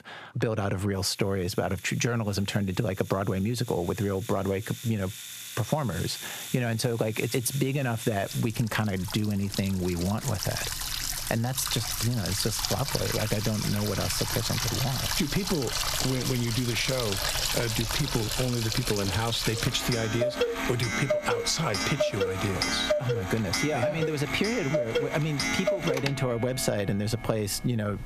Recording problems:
squashed, flat; somewhat, background pumping
household noises; loud; throughout; 2 dB below the speech

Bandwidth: 14.5 kHz